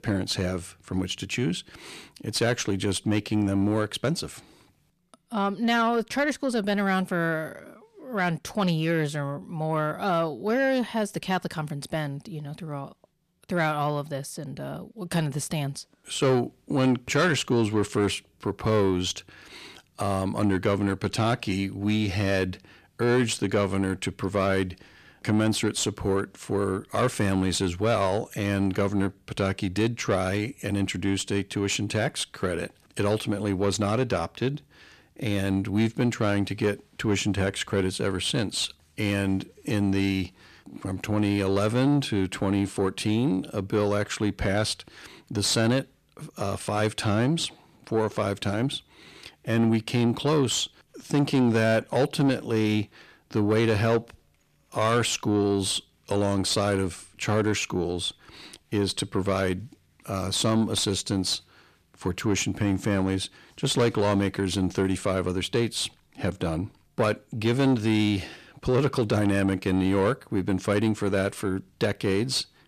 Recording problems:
distortion; slight; 10 dB below the speech

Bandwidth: 14.5 kHz